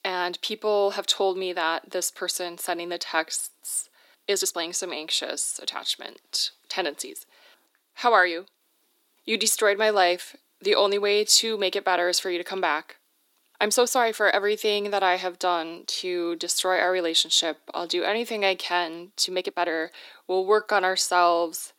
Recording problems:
thin; very; fading below 300 Hz
uneven, jittery; strongly; from 3.5 to 21 s

